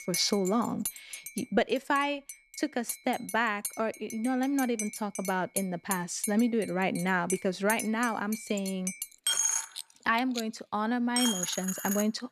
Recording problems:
household noises; loud; throughout; 5 dB below the speech

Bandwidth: 13.5 kHz